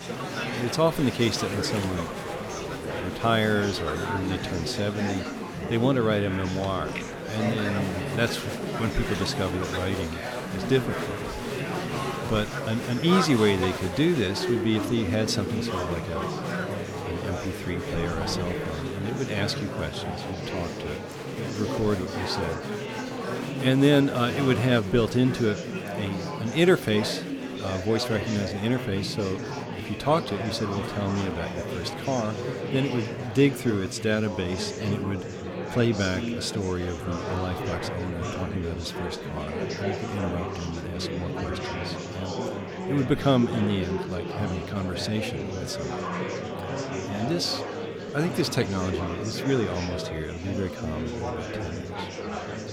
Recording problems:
murmuring crowd; loud; throughout; 4 dB below the speech

